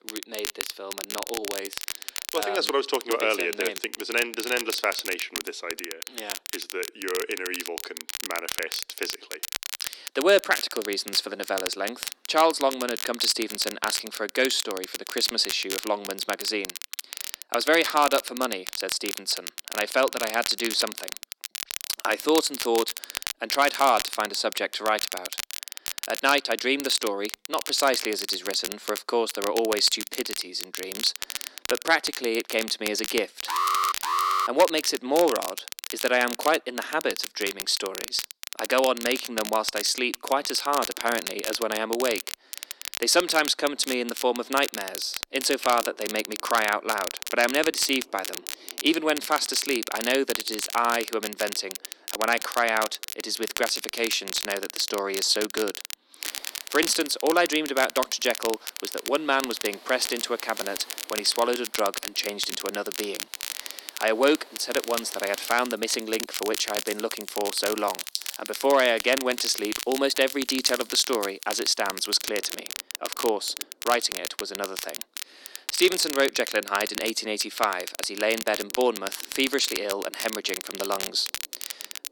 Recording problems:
thin; somewhat; fading below 300 Hz
crackle, like an old record; loud; 8 dB below the speech
rain or running water; faint; from 46 s on; 20 dB below the speech
alarm; loud; at 33 s; peak 2 dB above the speech

